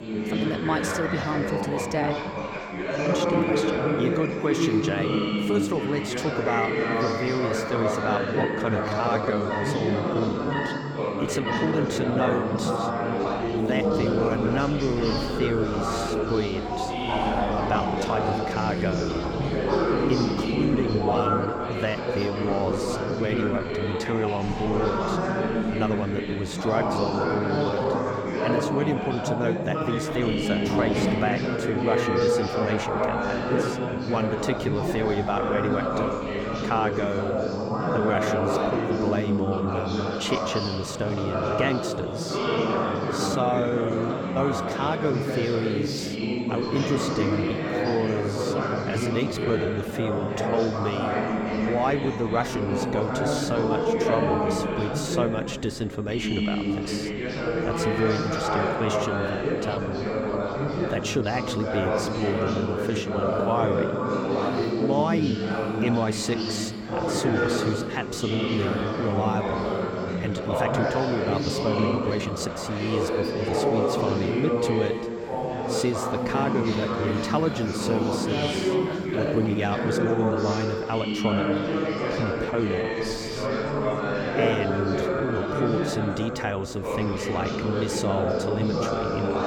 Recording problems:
chatter from many people; very loud; throughout; 2 dB above the speech
animal sounds; loud; throughout; 8 dB below the speech
high-pitched whine; faint; throughout; 7.5 kHz, 35 dB below the speech
uneven, jittery; strongly; from 3 s to 1:26

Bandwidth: 18 kHz